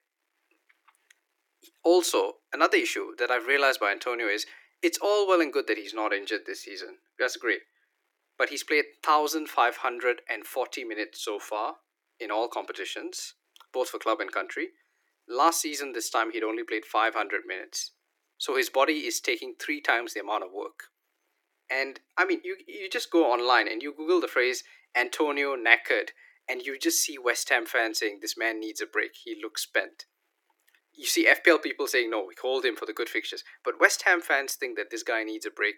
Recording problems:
thin; very; fading below 300 Hz

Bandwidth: 17.5 kHz